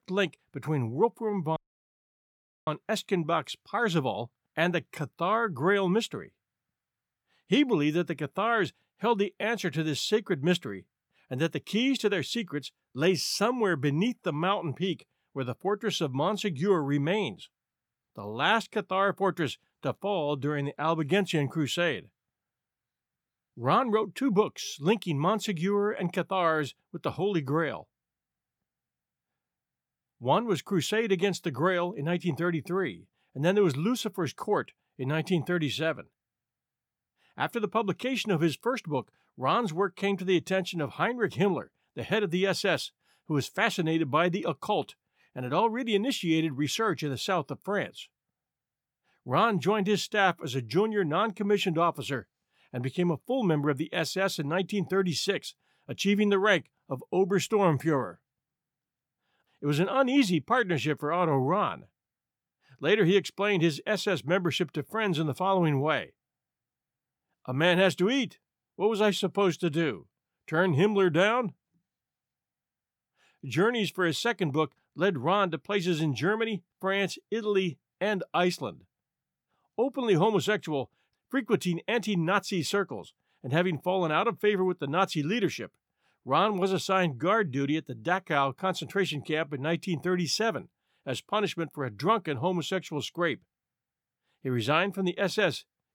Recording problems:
audio cutting out; at 1.5 s for 1 s

